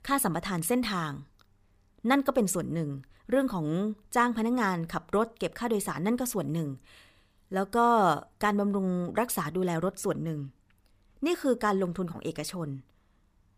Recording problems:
none

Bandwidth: 15 kHz